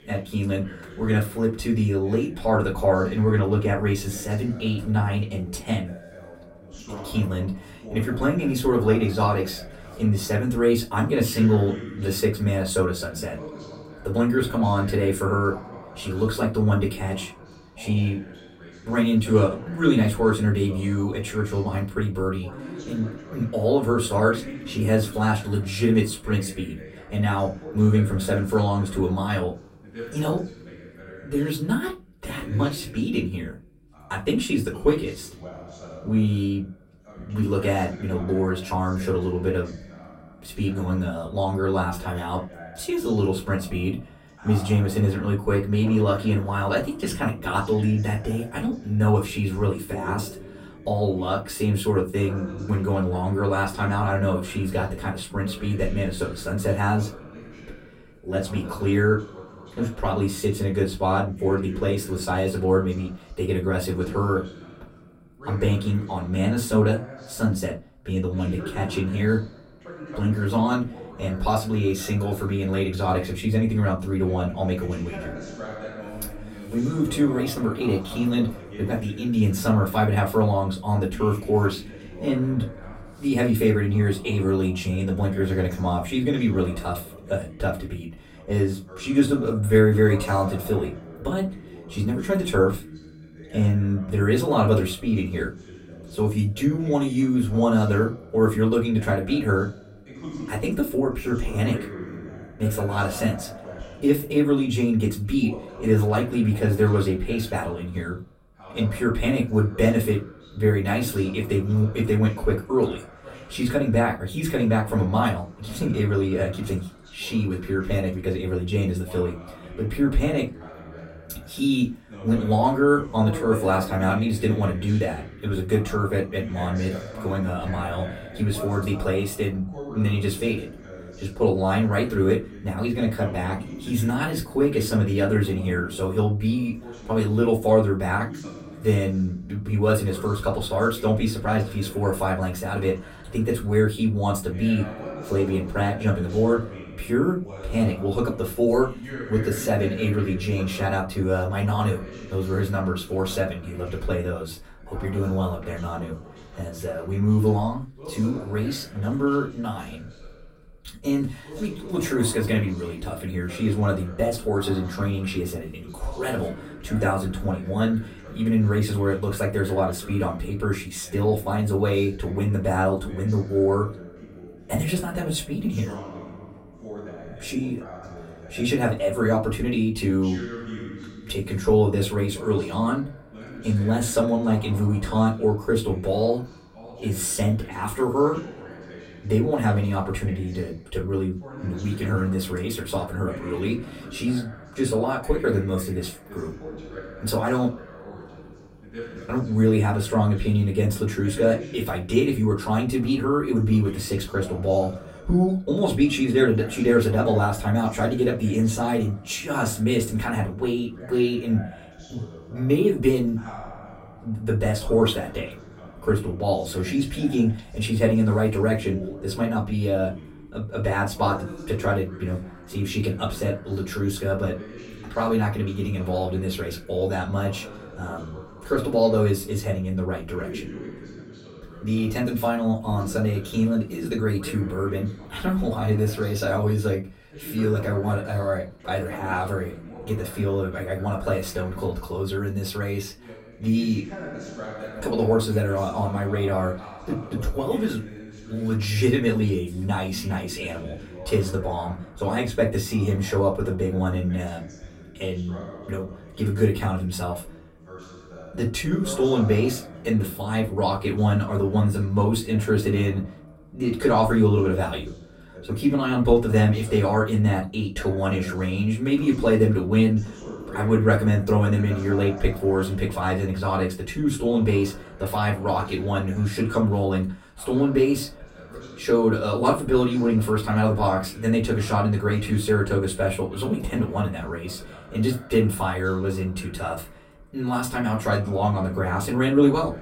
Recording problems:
off-mic speech; far
room echo; very slight; dies away in 0.2 s
voice in the background; noticeable; throughout; 15 dB below the speech

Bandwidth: 16 kHz